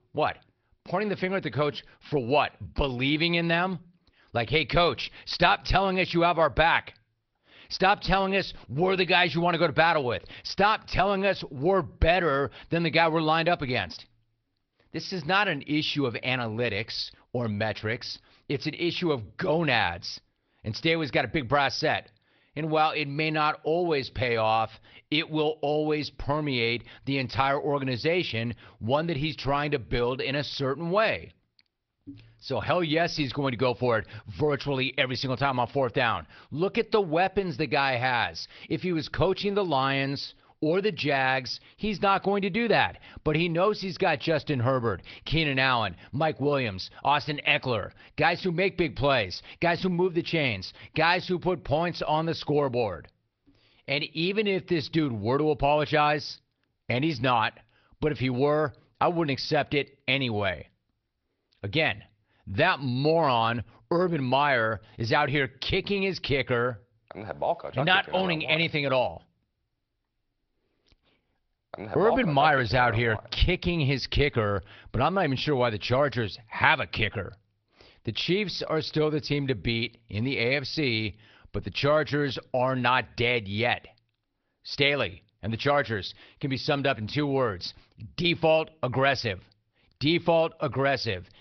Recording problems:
garbled, watery; slightly; nothing above 5.5 kHz
high frequencies cut off; slight

